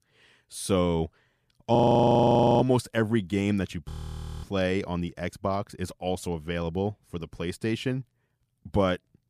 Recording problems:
audio freezing; at 2 s for 1 s and at 4 s for 0.5 s

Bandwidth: 15 kHz